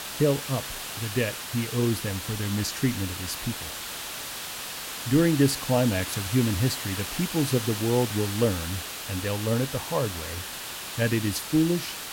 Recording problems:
hiss; loud; throughout; 6 dB below the speech

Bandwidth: 16.5 kHz